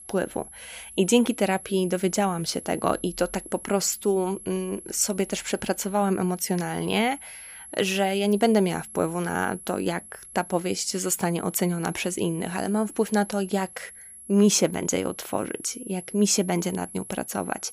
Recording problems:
high-pitched whine; noticeable; throughout; 11 kHz, 15 dB below the speech

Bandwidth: 15 kHz